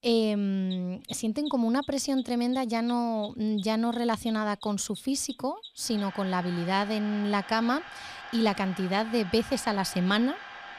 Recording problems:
machinery noise; noticeable; throughout; 15 dB below the speech

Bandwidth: 15 kHz